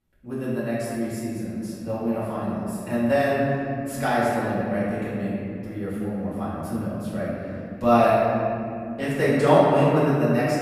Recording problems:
room echo; strong; dies away in 2.8 s
off-mic speech; far

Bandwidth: 14.5 kHz